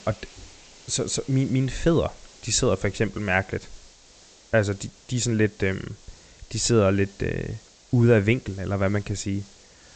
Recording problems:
high frequencies cut off; noticeable; nothing above 8 kHz
hiss; faint; throughout; 25 dB below the speech

